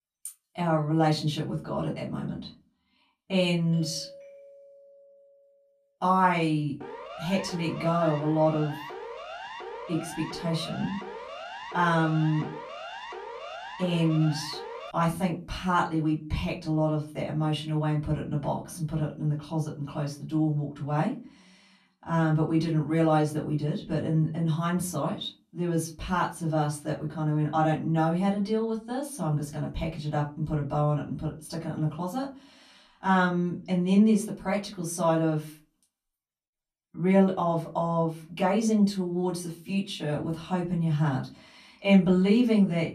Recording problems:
off-mic speech; far
room echo; very slight; dies away in 0.3 s
doorbell; faint; from 3.5 to 5.5 s; peak 20 dB below the speech
siren; faint; from 7 to 15 s; peak 10 dB below the speech

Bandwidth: 14.5 kHz